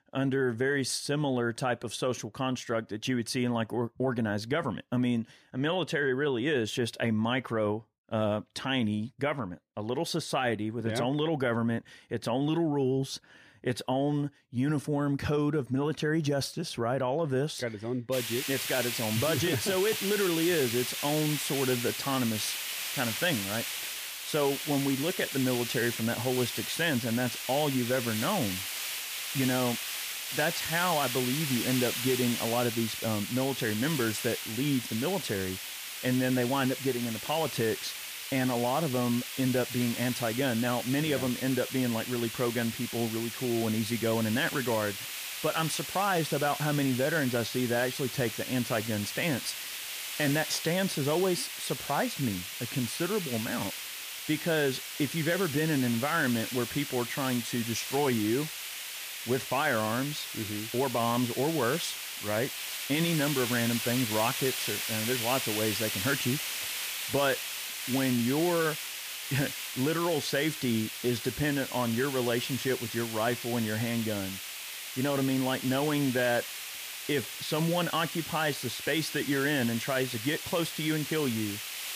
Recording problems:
hiss; loud; from 18 s on; 4 dB below the speech

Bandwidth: 15 kHz